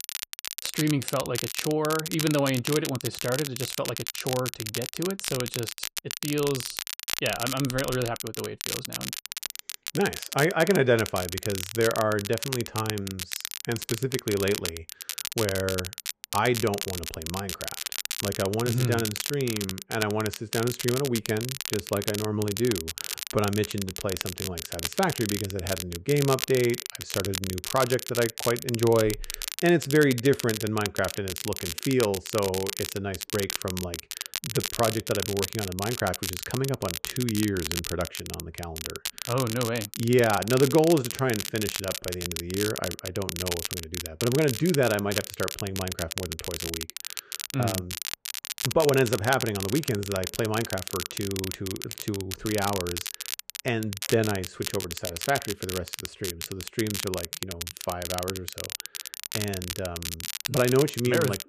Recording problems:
crackle, like an old record; loud; 5 dB below the speech

